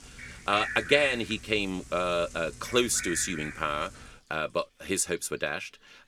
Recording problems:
animal sounds; loud; throughout; 9 dB below the speech
household noises; noticeable; throughout; 20 dB below the speech

